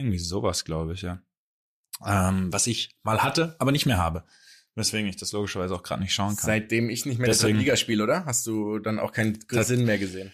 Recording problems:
abrupt cut into speech; at the start

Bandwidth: 14.5 kHz